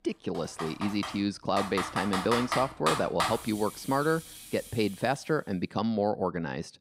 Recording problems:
household noises; loud; until 5 s; 4 dB below the speech

